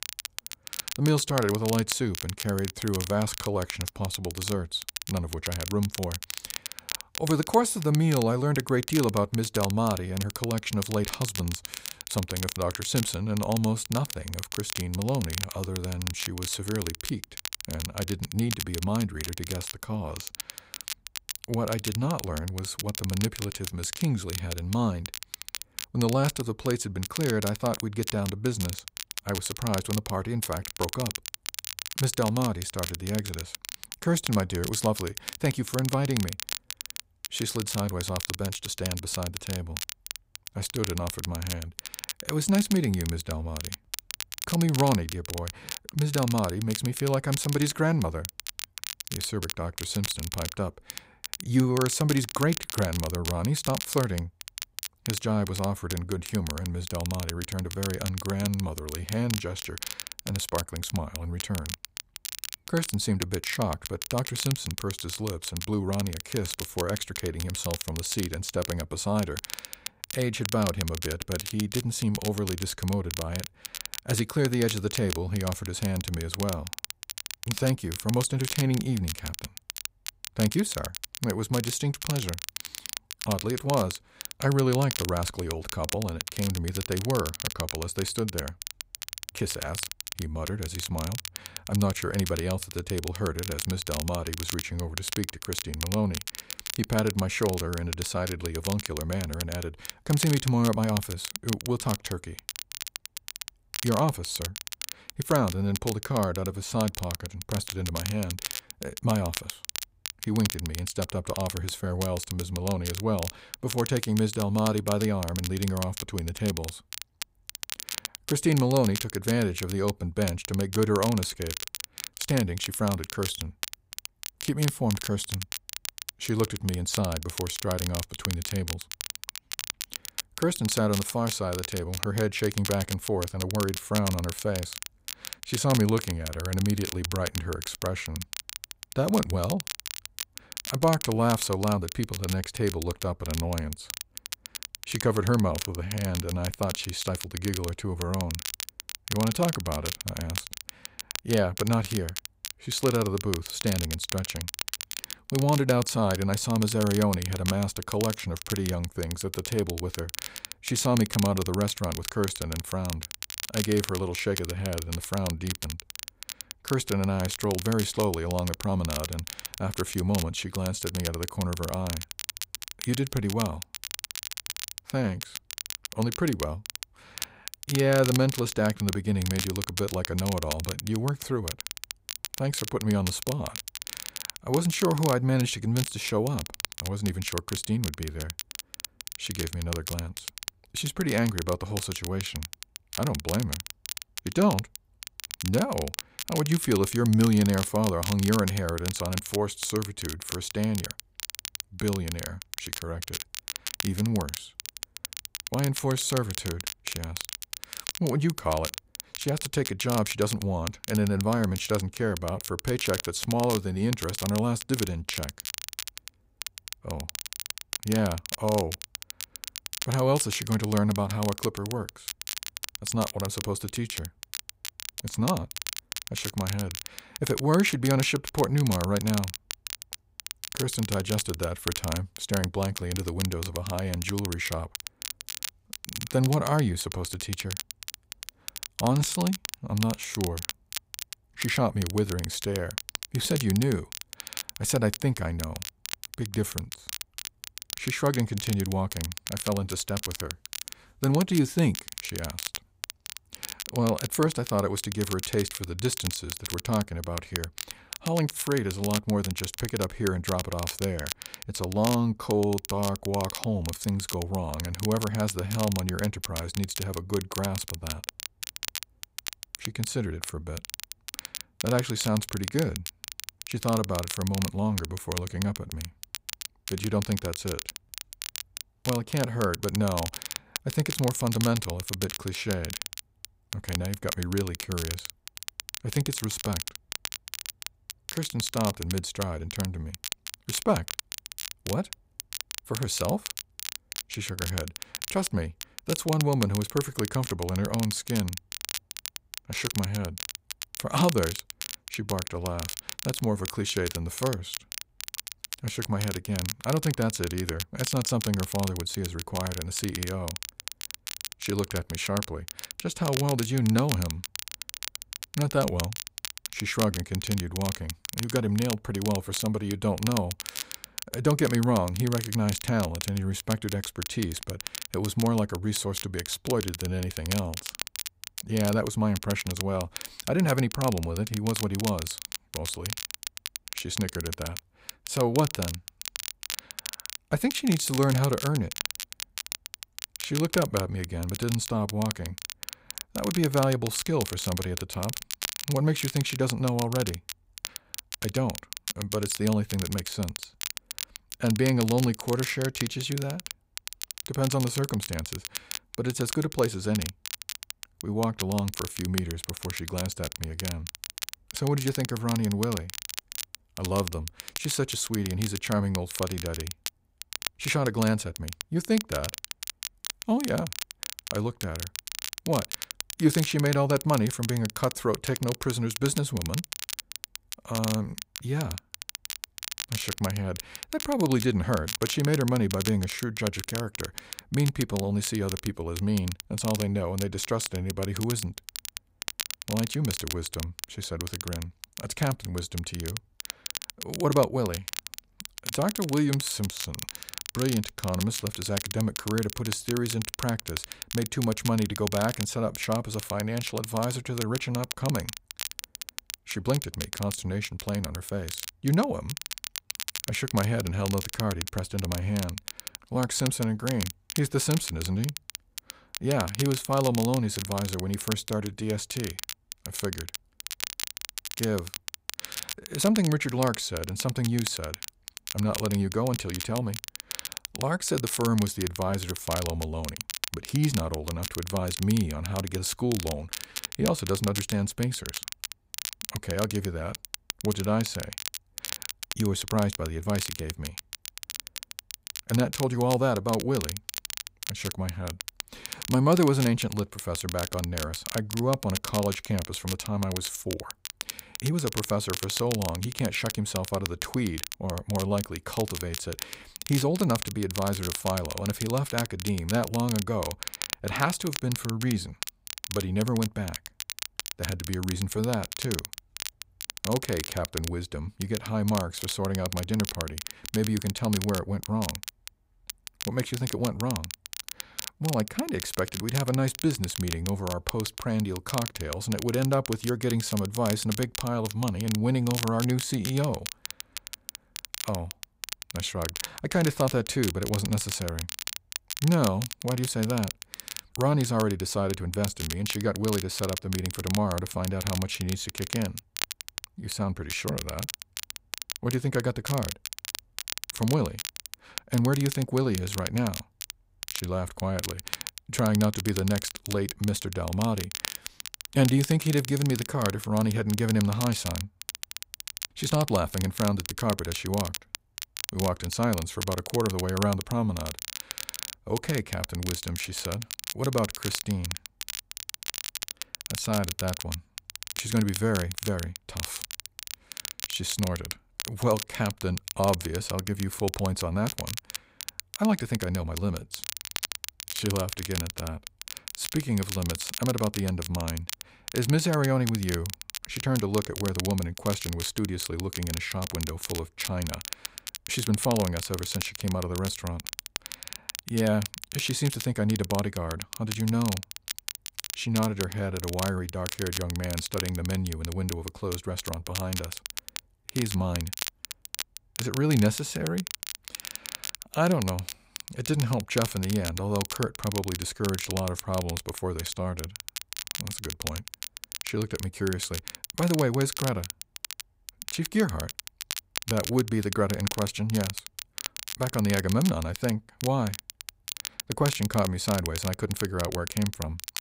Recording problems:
crackle, like an old record; loud; 7 dB below the speech

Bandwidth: 15.5 kHz